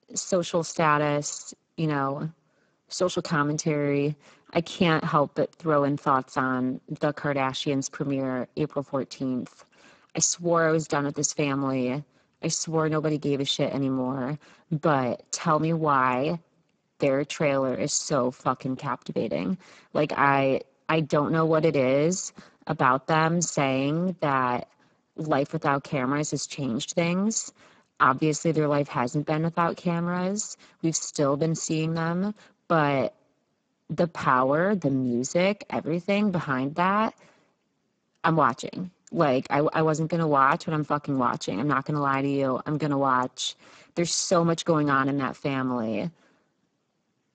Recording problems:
garbled, watery; badly; nothing above 7.5 kHz

